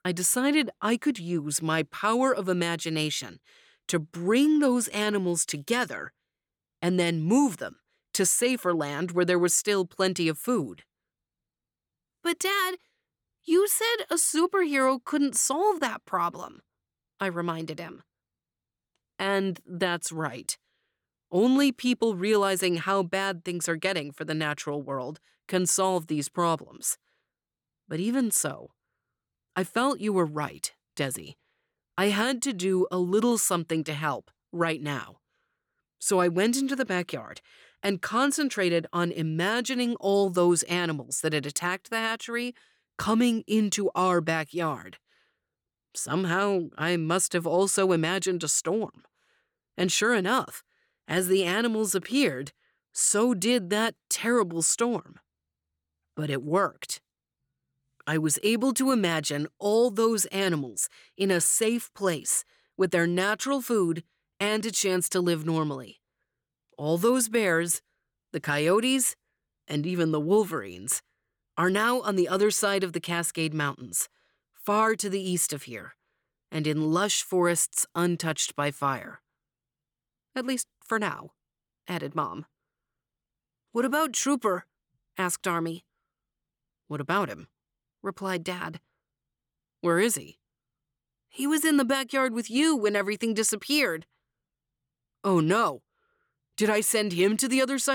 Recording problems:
abrupt cut into speech; at the end

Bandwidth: 18.5 kHz